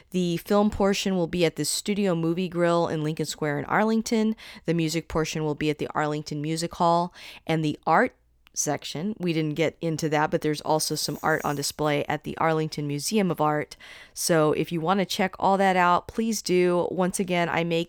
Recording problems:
none

